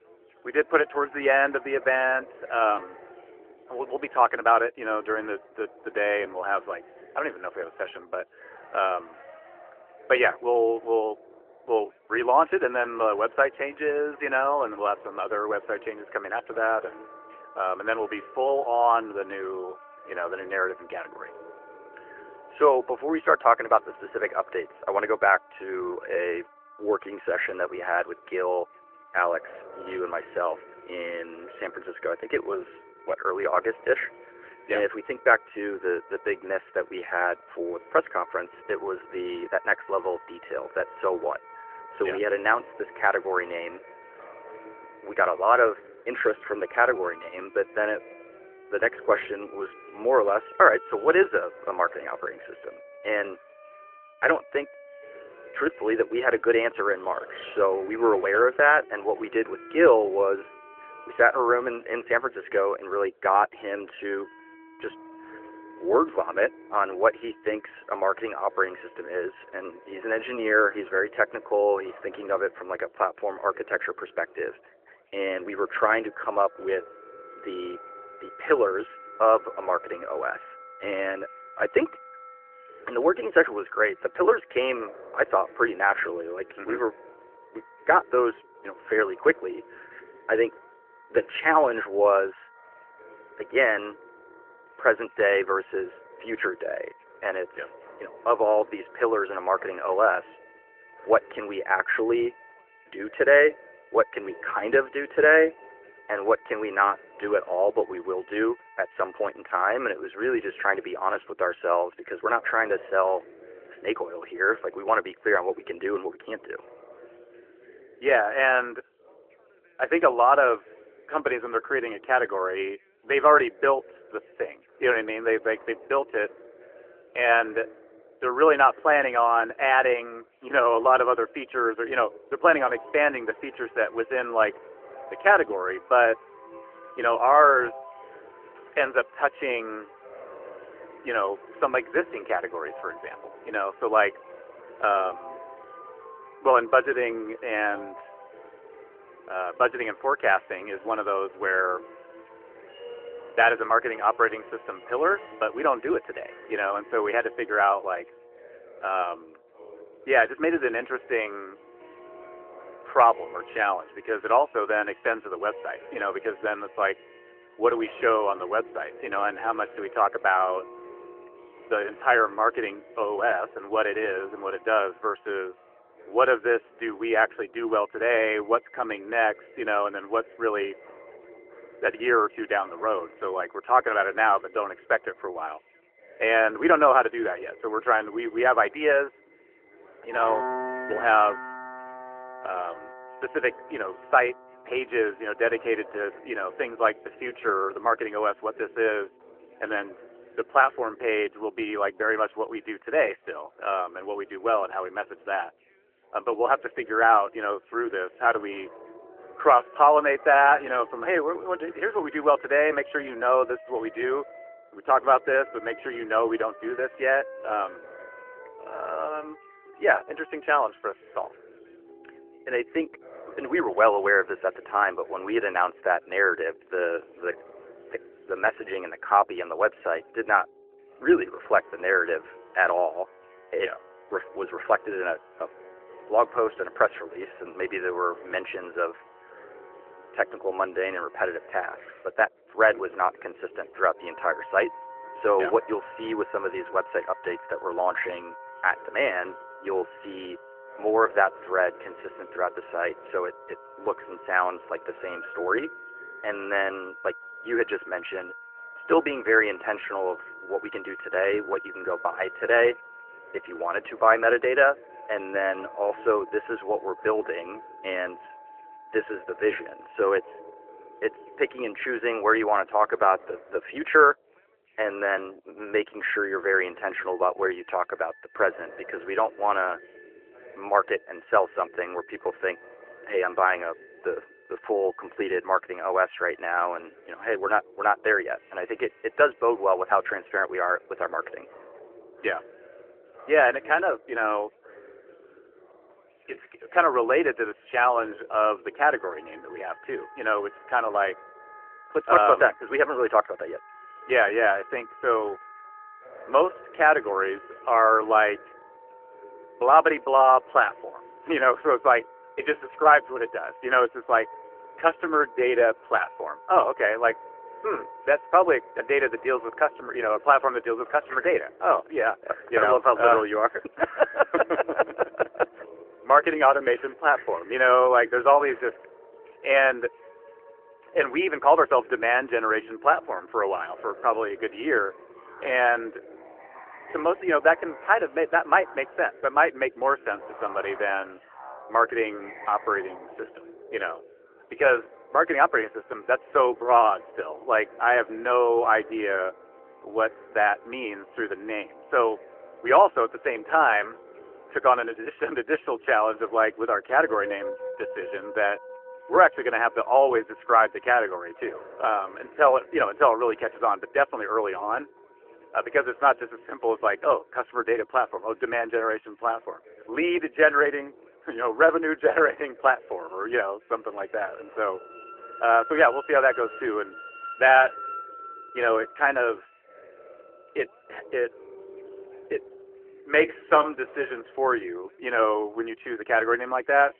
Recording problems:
muffled; very; fading above 4 kHz
phone-call audio
background music; faint; throughout; 20 dB below the speech
background chatter; faint; throughout; 2 voices, 25 dB below the speech

